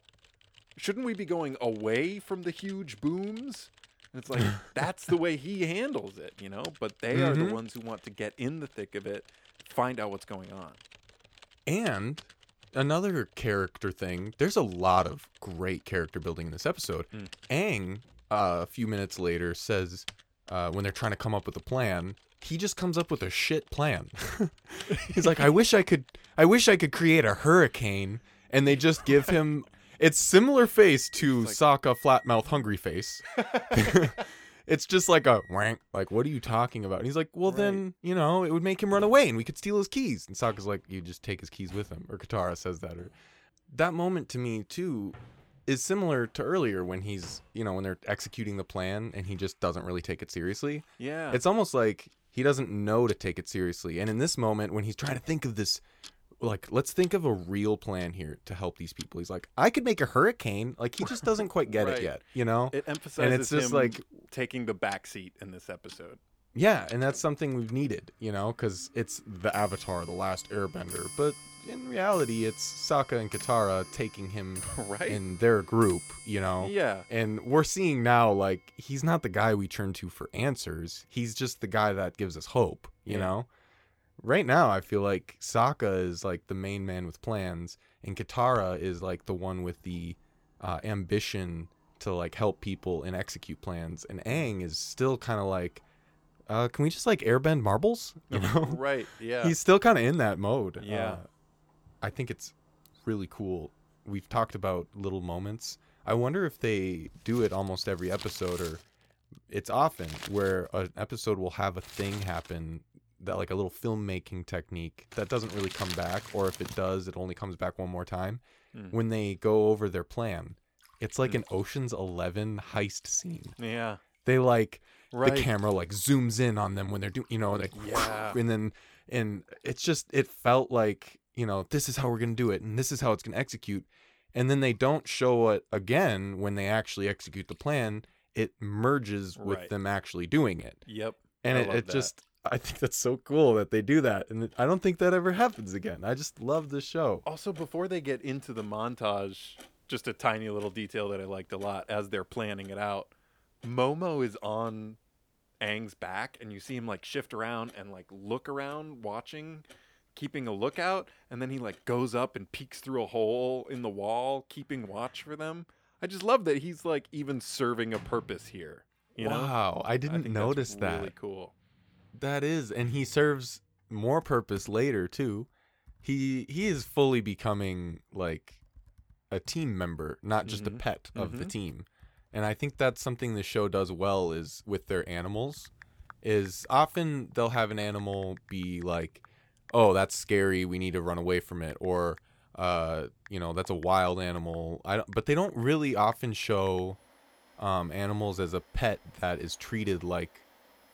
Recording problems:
household noises; noticeable; throughout; 20 dB below the speech

